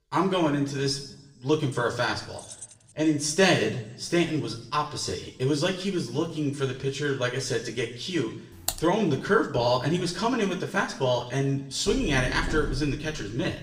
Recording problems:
room echo; slight; dies away in 0.7 s
off-mic speech; somewhat distant
jangling keys; faint; at 2.5 s; peak 15 dB below the speech
keyboard typing; noticeable; at 8.5 s; peak 5 dB below the speech
door banging; noticeable; from 12 s on; peak 7 dB below the speech

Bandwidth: 15.5 kHz